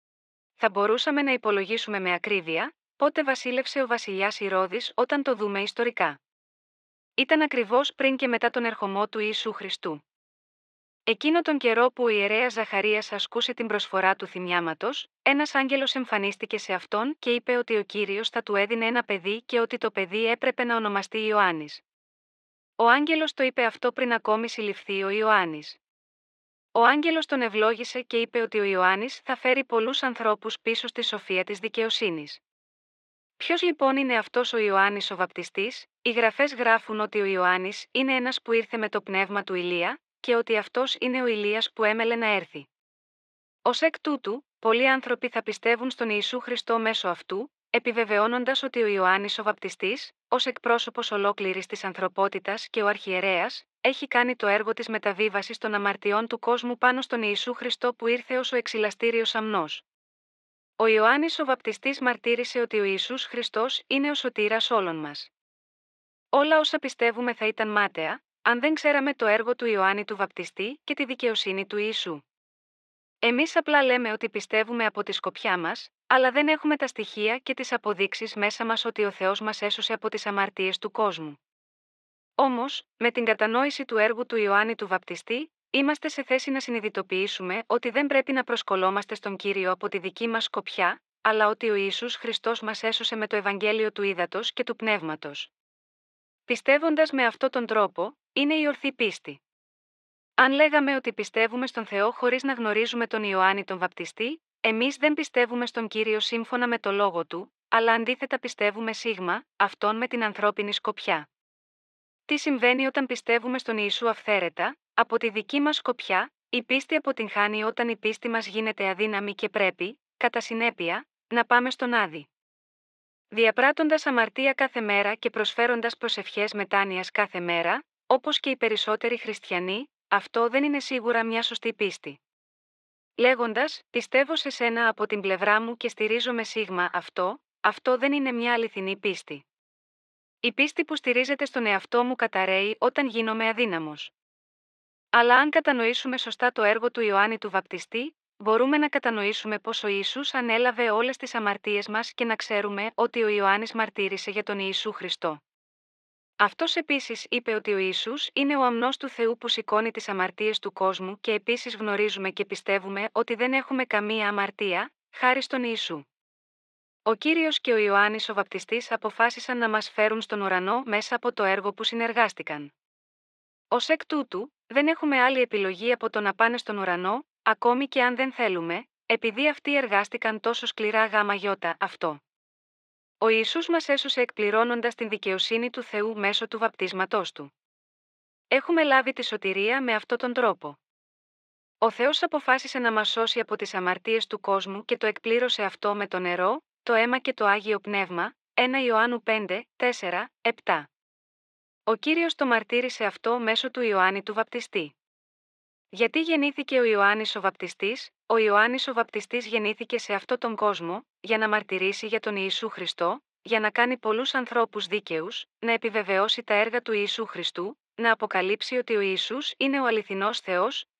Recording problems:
muffled; slightly; fading above 3.5 kHz
thin; somewhat; fading below 500 Hz

